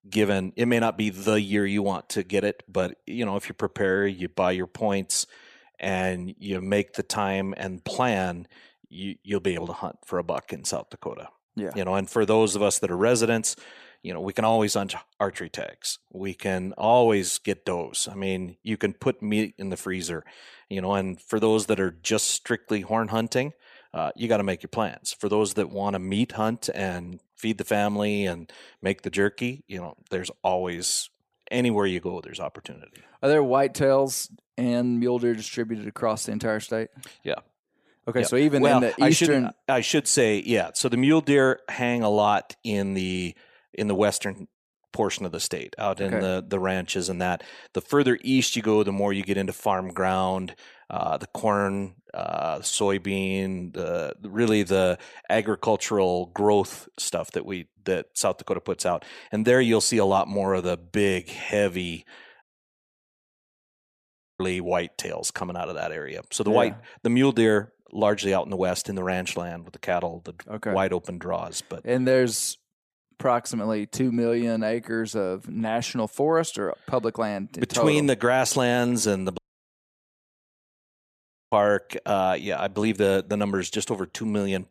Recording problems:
audio cutting out; at 1:02 for 2 s and at 1:19 for 2 s

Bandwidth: 14.5 kHz